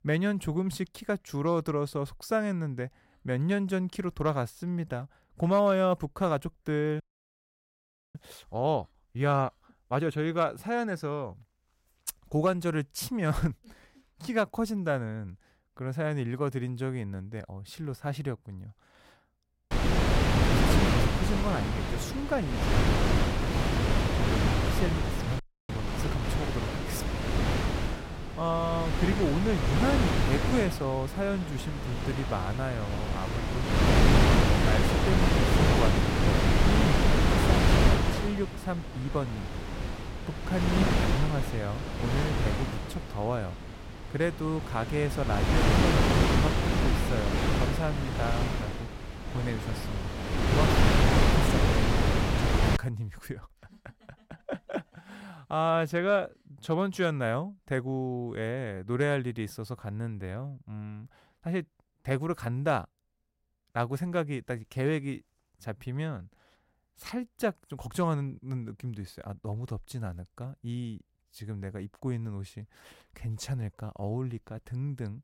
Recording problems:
wind noise on the microphone; heavy; from 20 to 53 s; 3 dB above the speech
audio freezing; at 7 s for 1 s and at 25 s

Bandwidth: 16 kHz